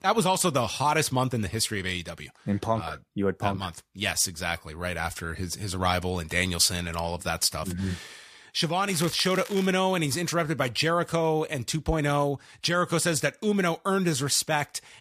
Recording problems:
crackling; noticeable; at 9 s; 15 dB below the speech

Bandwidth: 14.5 kHz